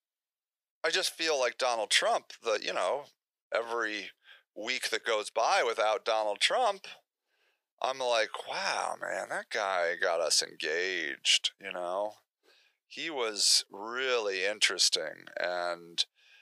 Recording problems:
thin; very; fading below 500 Hz

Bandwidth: 15 kHz